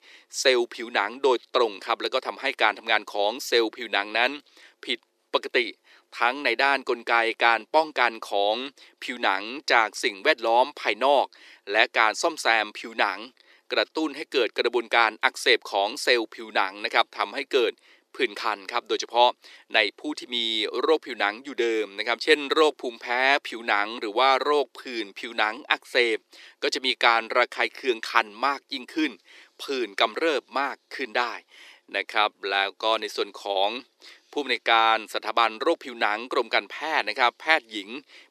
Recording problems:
thin; very; fading below 350 Hz

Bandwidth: 14 kHz